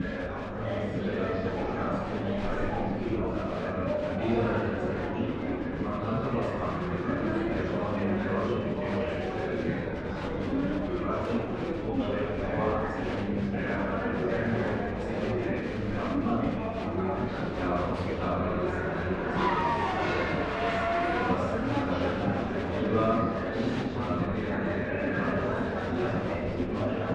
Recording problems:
room echo; strong; dies away in 1.1 s
off-mic speech; far
muffled; slightly; fading above 3 kHz
traffic noise; very loud; throughout; 3 dB above the speech
murmuring crowd; very loud; throughout; 3 dB above the speech
low rumble; noticeable; throughout; 15 dB below the speech

